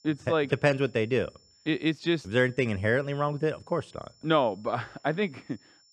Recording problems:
high-pitched whine; faint; throughout; 5.5 kHz, 30 dB below the speech

